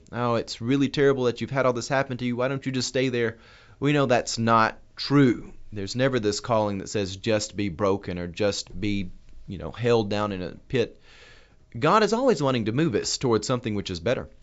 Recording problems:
high frequencies cut off; noticeable; nothing above 8 kHz

